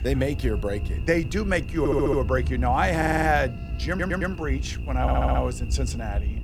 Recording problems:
electrical hum; noticeable; throughout; 60 Hz, 20 dB below the speech
low rumble; faint; throughout; 20 dB below the speech
audio stuttering; 4 times, first at 2 s

